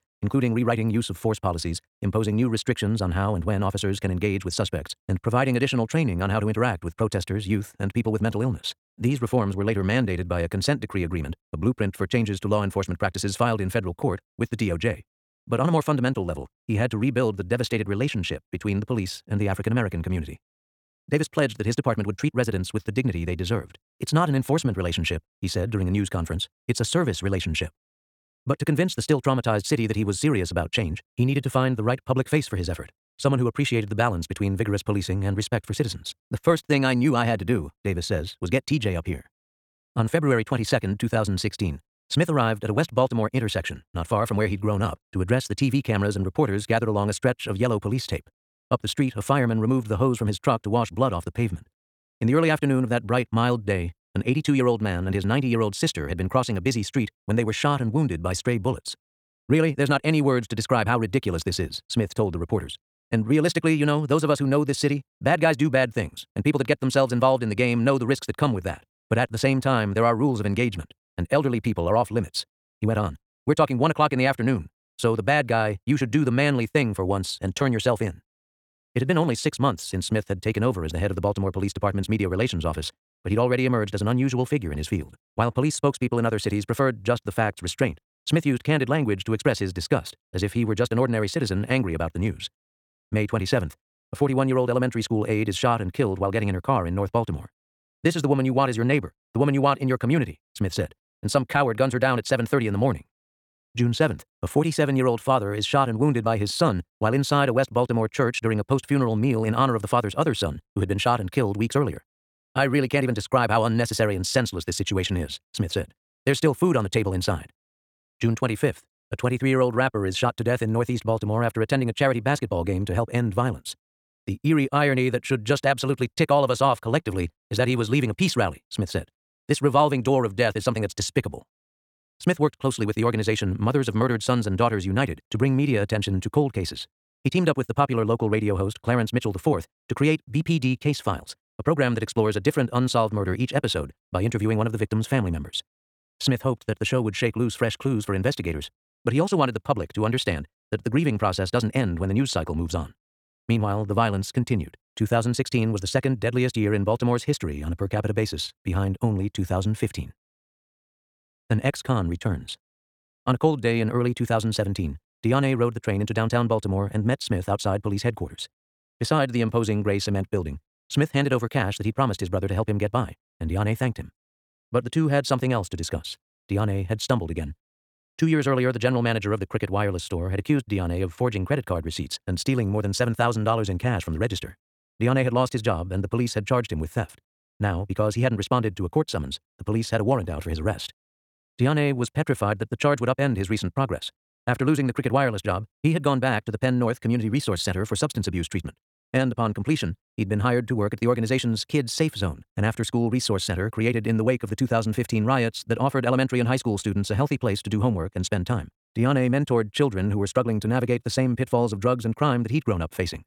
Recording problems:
wrong speed, natural pitch; too fast; 1.6 times normal speed

